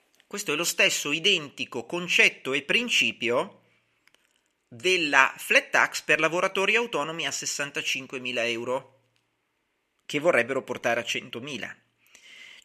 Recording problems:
thin; somewhat; fading below 1 kHz

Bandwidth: 14 kHz